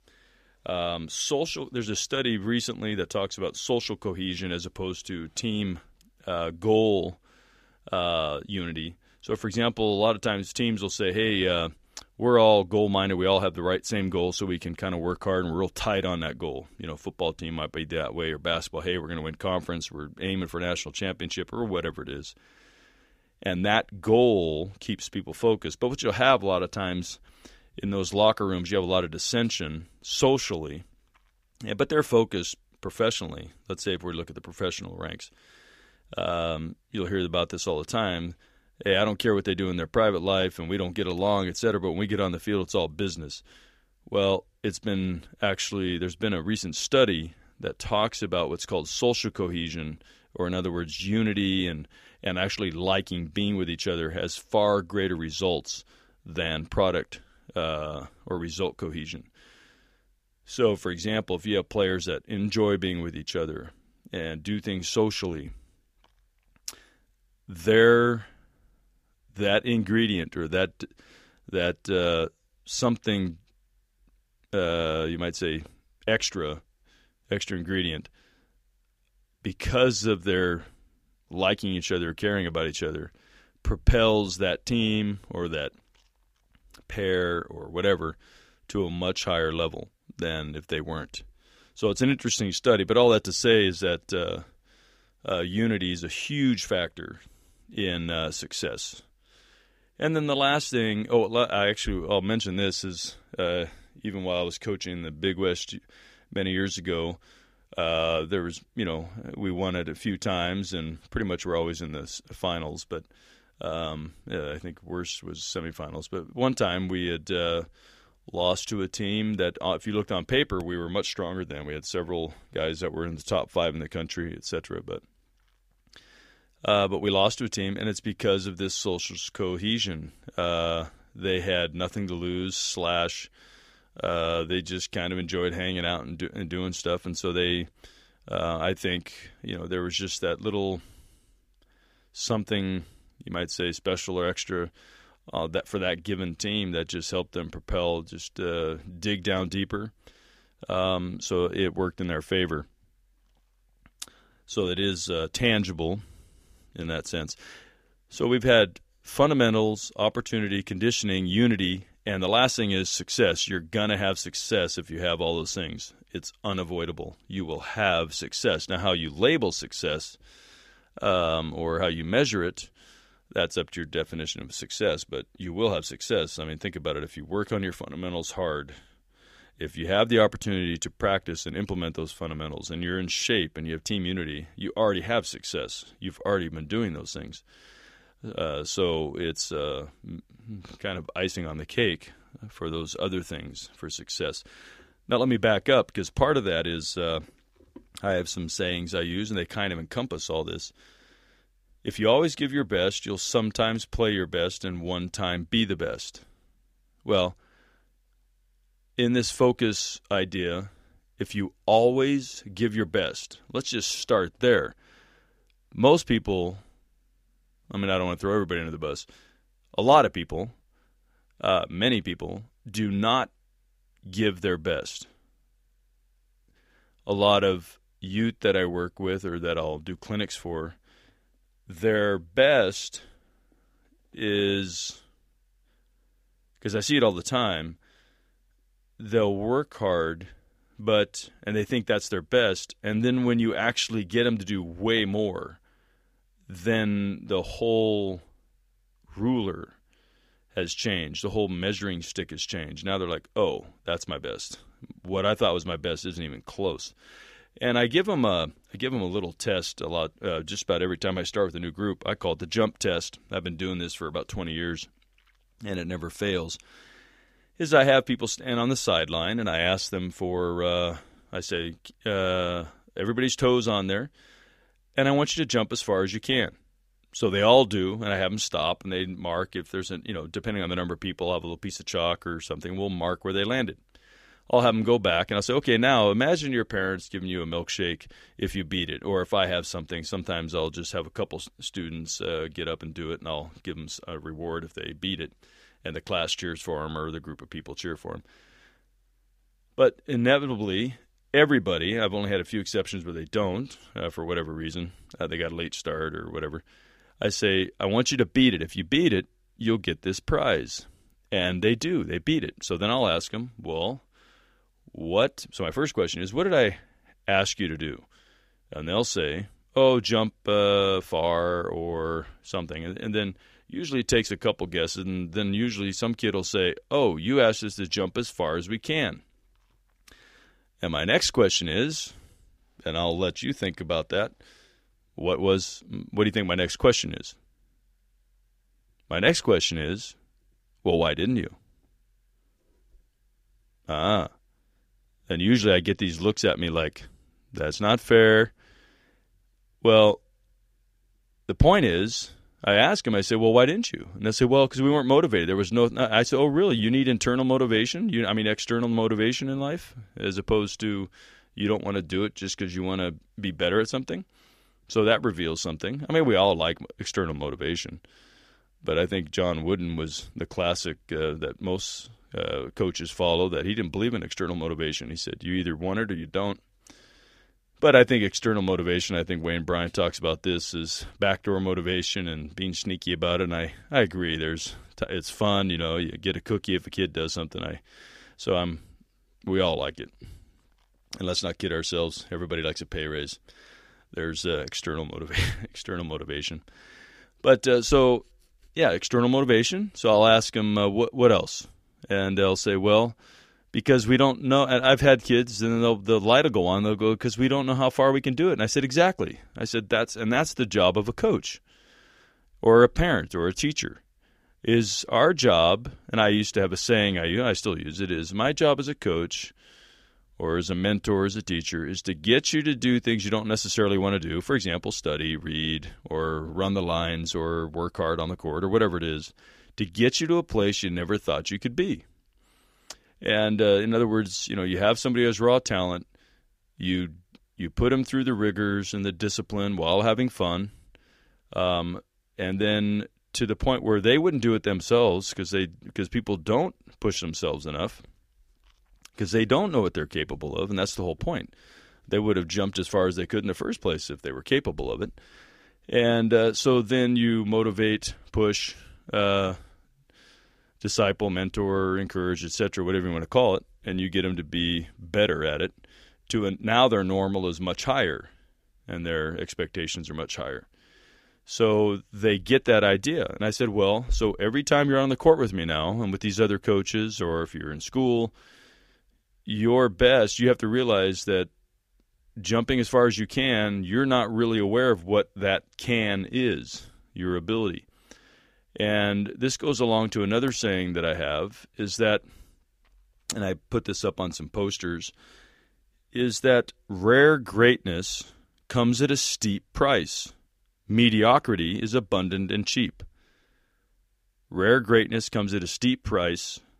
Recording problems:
none

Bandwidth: 15 kHz